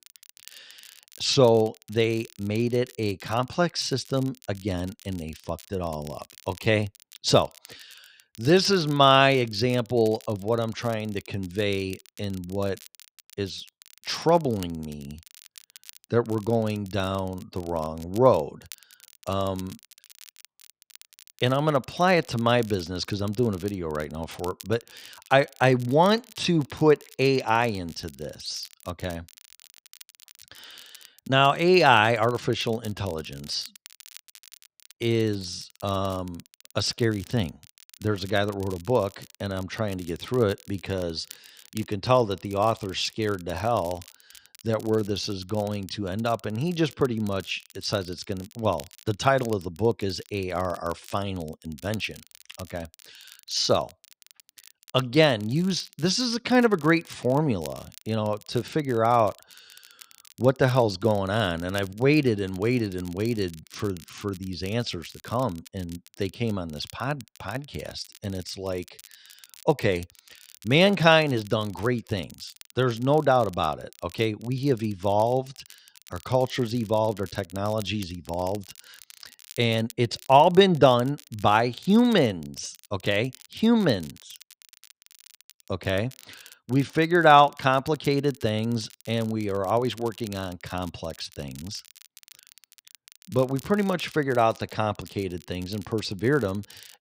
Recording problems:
crackle, like an old record; faint; 25 dB below the speech

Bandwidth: 15.5 kHz